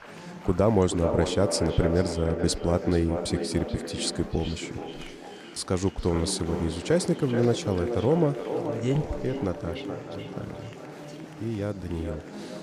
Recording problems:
echo of what is said; strong; throughout; 430 ms later, 7 dB below the speech
murmuring crowd; noticeable; throughout; 15 dB below the speech

